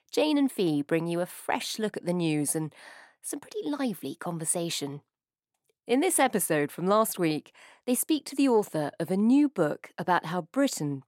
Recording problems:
none

